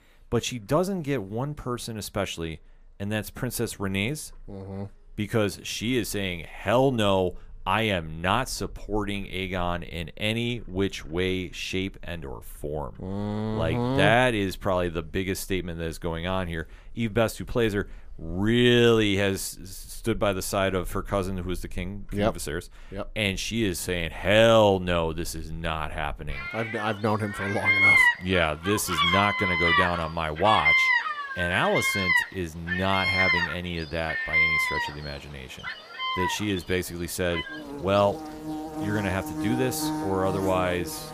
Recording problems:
animal sounds; very loud; throughout; 2 dB above the speech

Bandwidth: 15 kHz